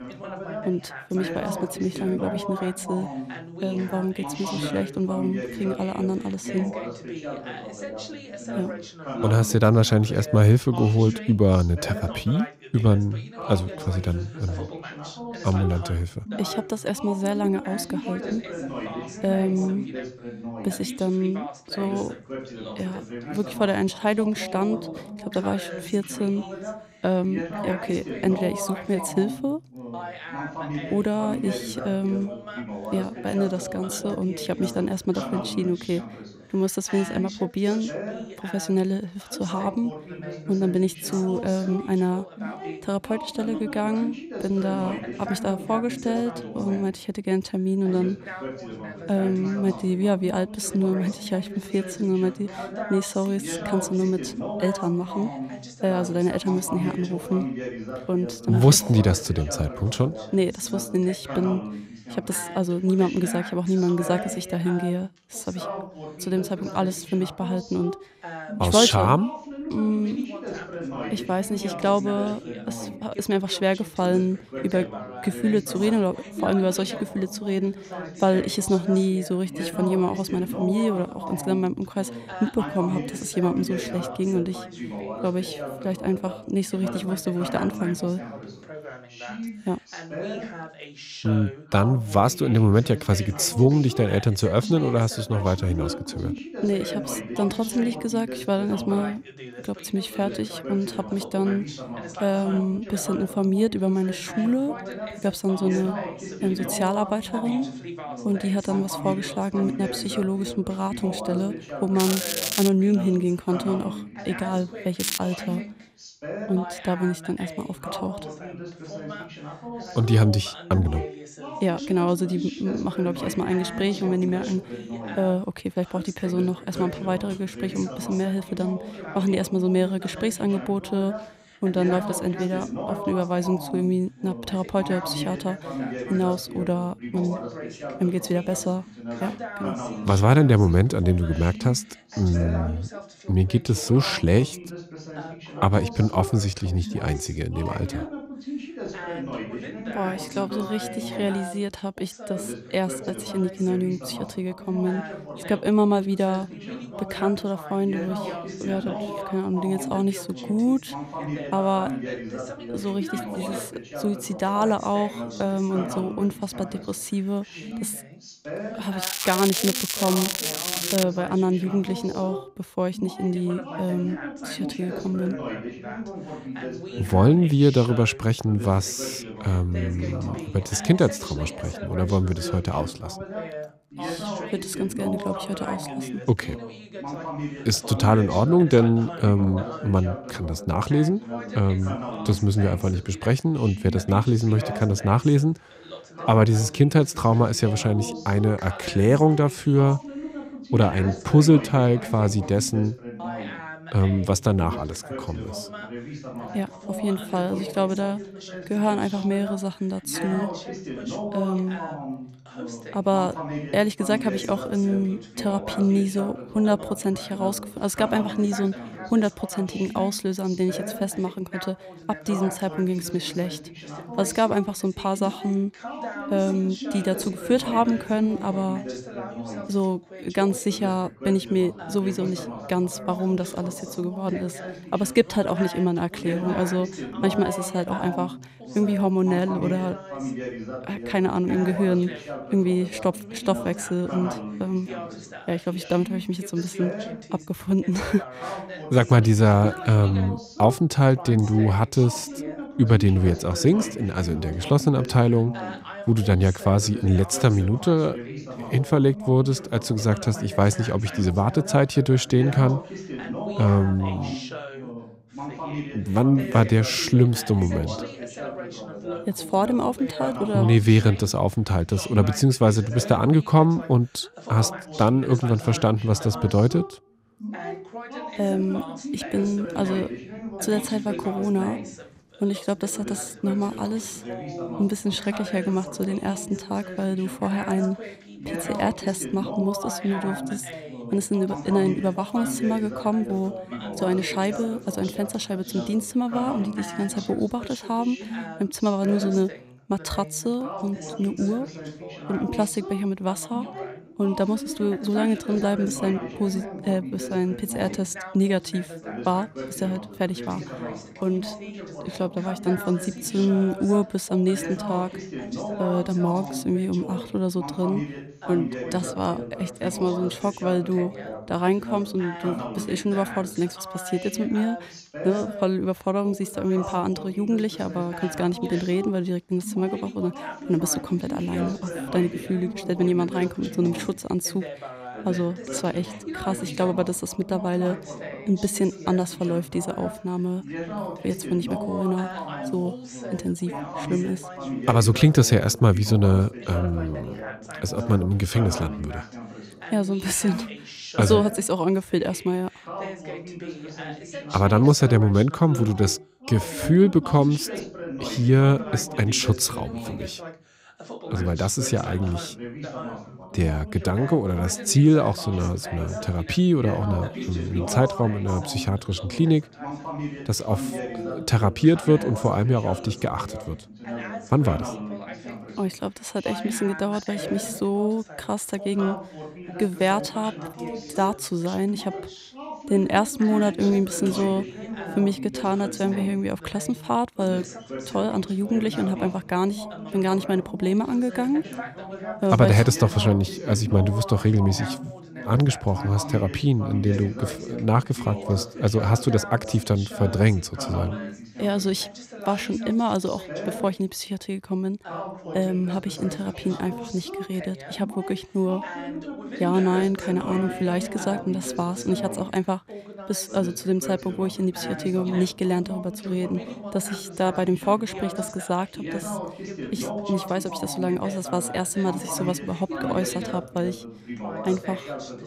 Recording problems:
crackling; loud; at 1:52, at 1:55 and from 2:49 to 2:51; 2 dB below the speech
background chatter; noticeable; throughout; 2 voices, 10 dB below the speech

